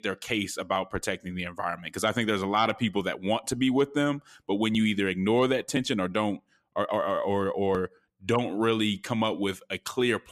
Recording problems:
none

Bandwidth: 14.5 kHz